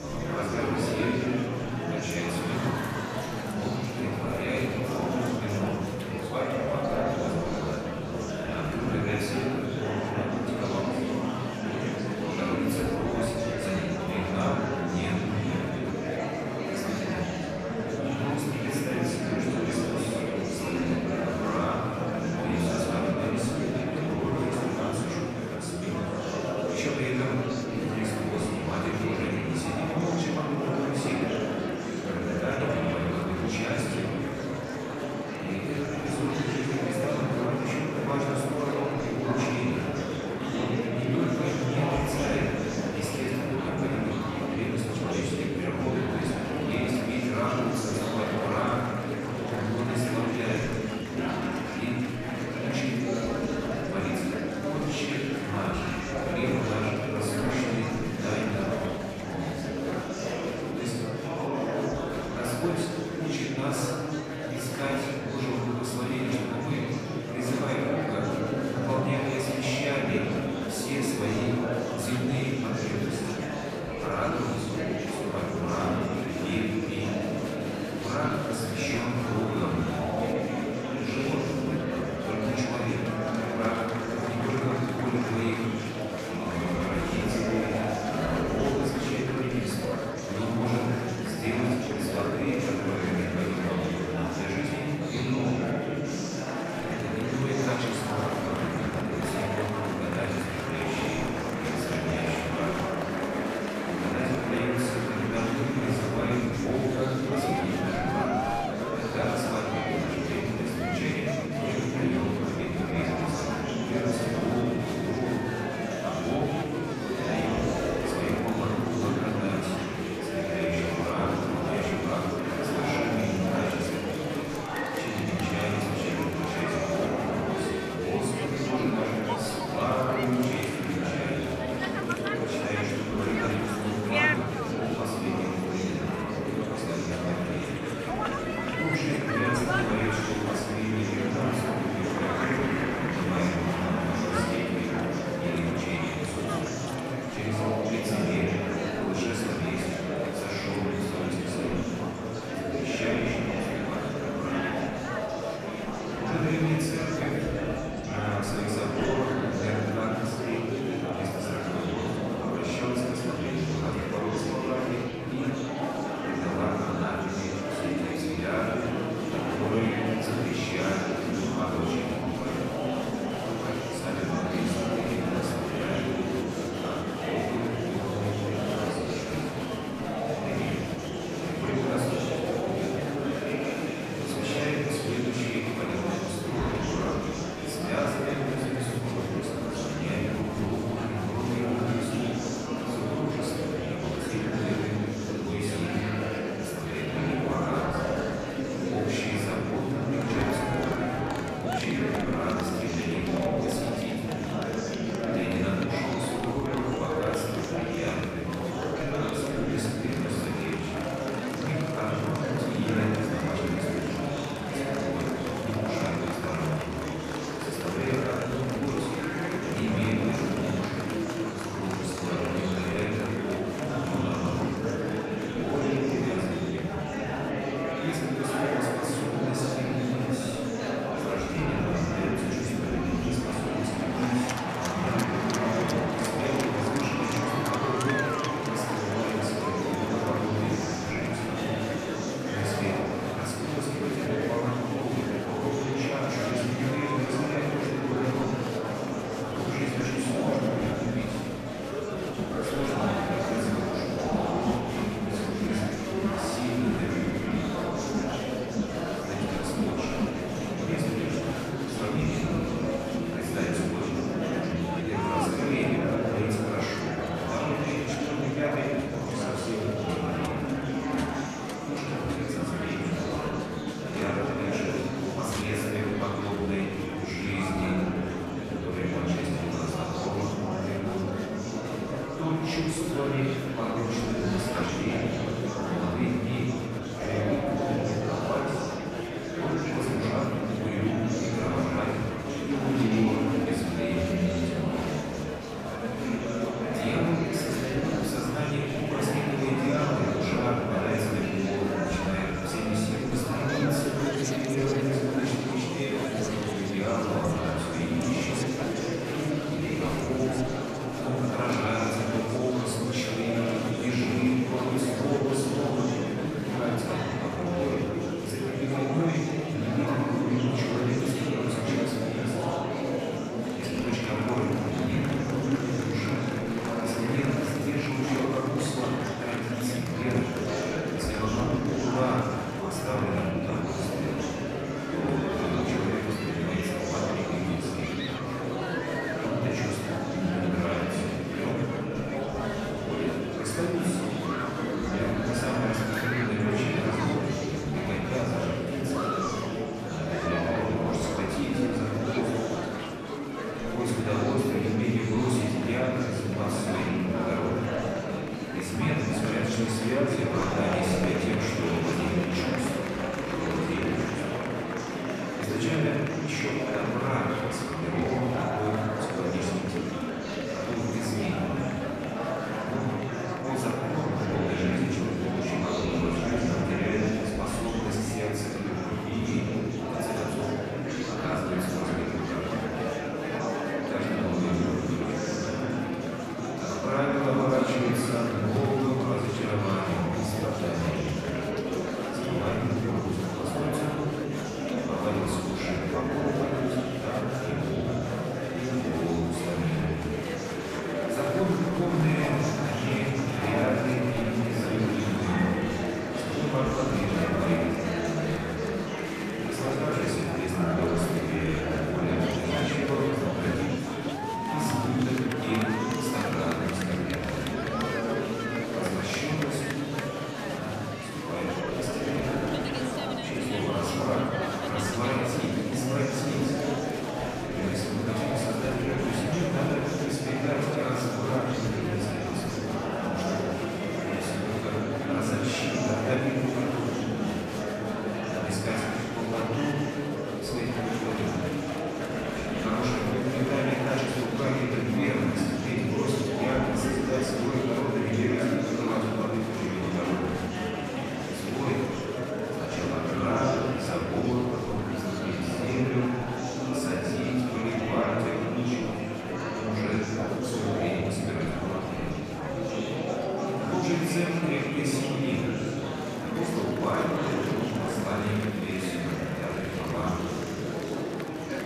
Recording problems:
off-mic speech; far
room echo; noticeable; dies away in 1.7 s
murmuring crowd; very loud; throughout; as loud as the speech
abrupt cut into speech; at the start

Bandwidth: 14.5 kHz